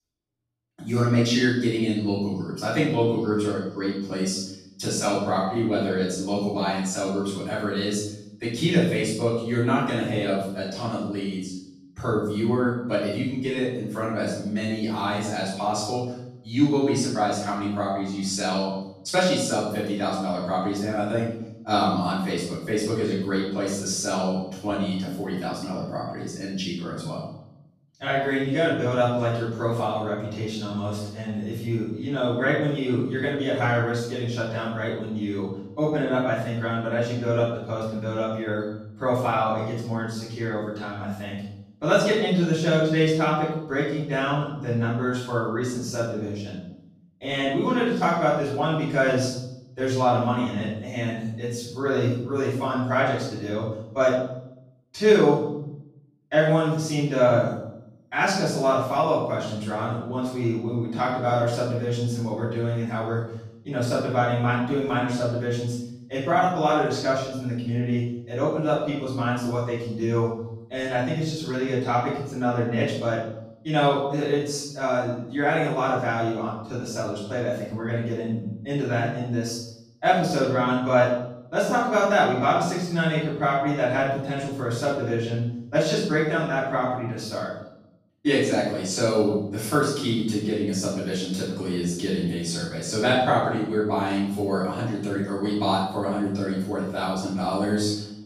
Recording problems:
off-mic speech; far
room echo; noticeable; dies away in 0.7 s

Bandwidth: 14.5 kHz